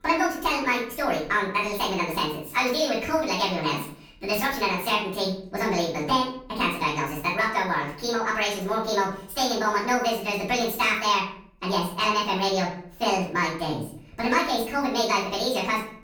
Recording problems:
off-mic speech; far
wrong speed and pitch; too fast and too high; 1.6 times normal speed
room echo; noticeable; dies away in 0.5 s

